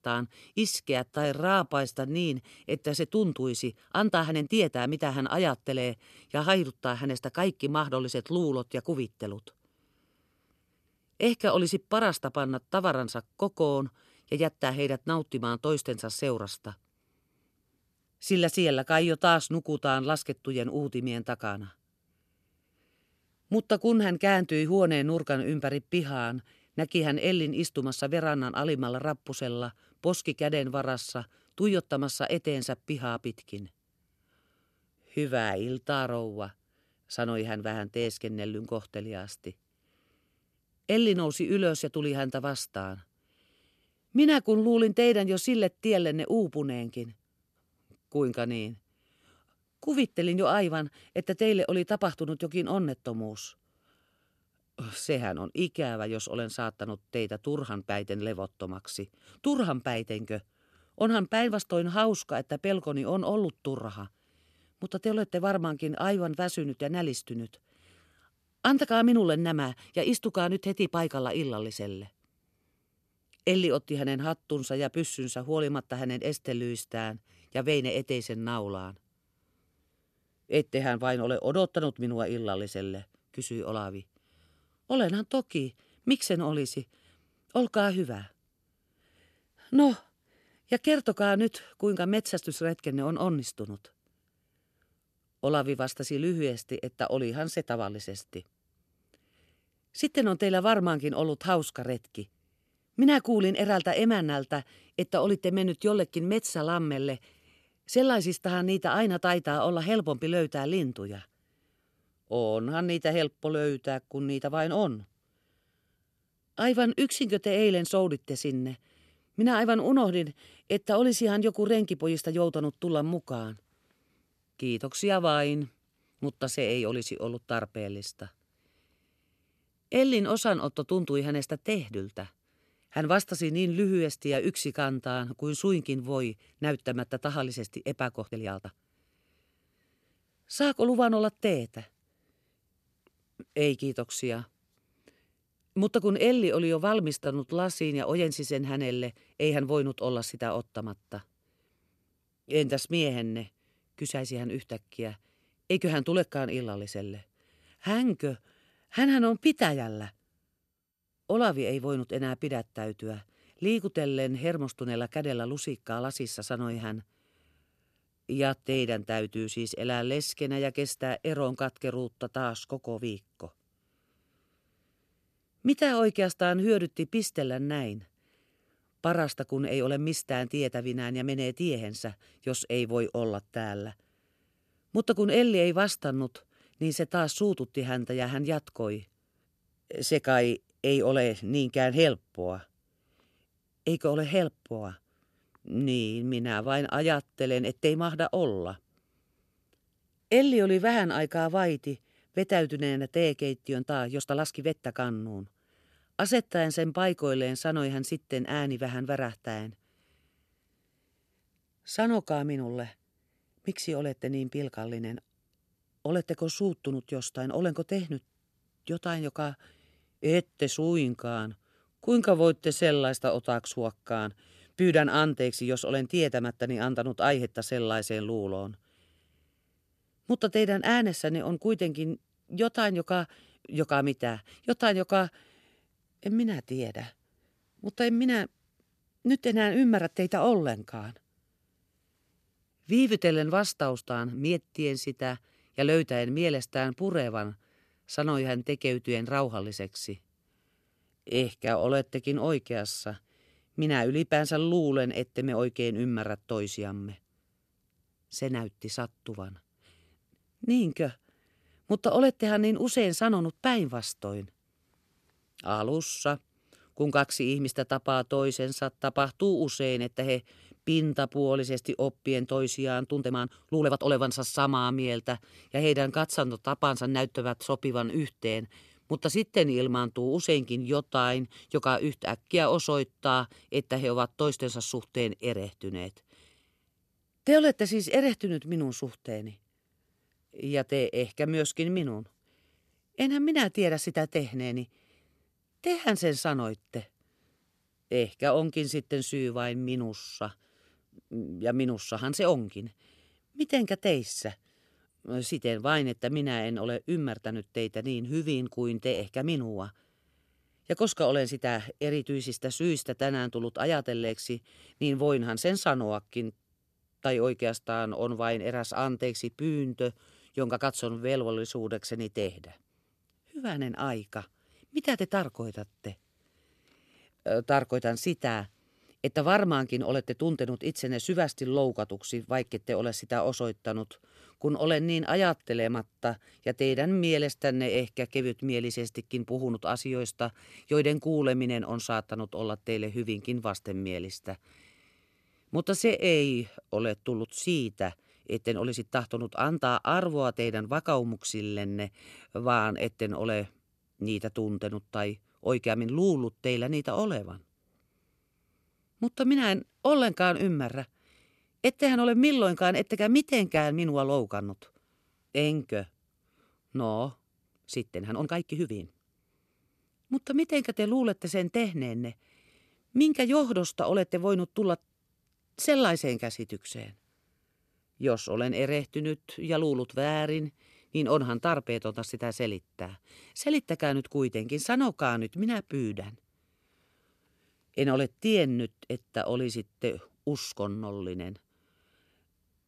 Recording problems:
uneven, jittery; strongly; from 1 s to 6:09

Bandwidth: 13.5 kHz